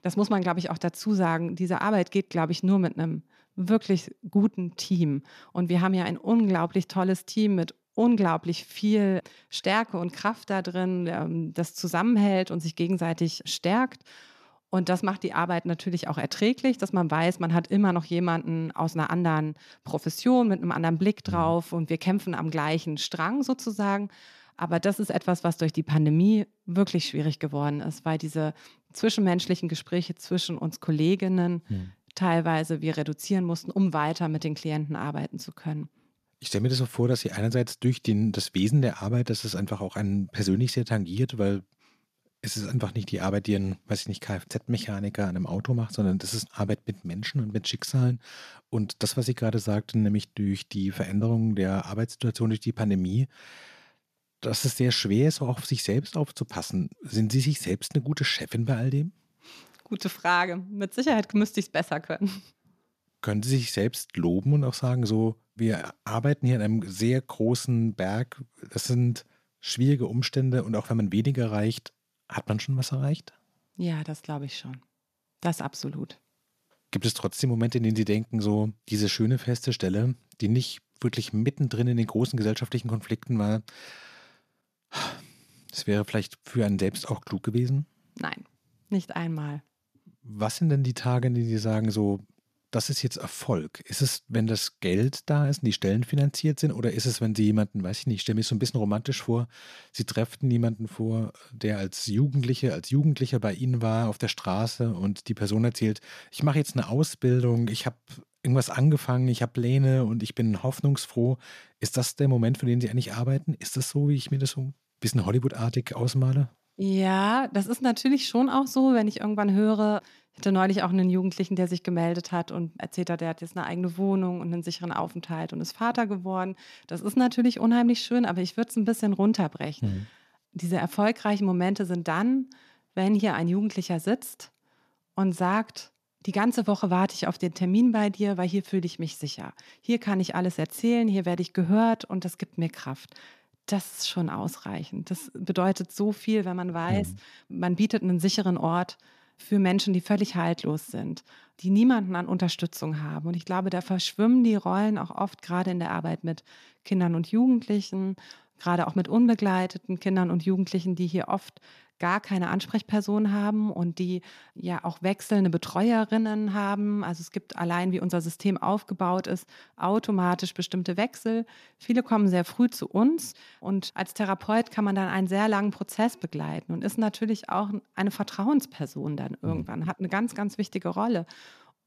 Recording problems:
none

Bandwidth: 14.5 kHz